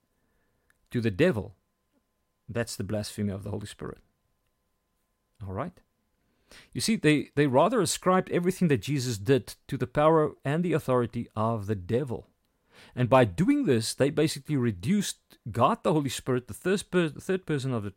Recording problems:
none

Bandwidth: 16 kHz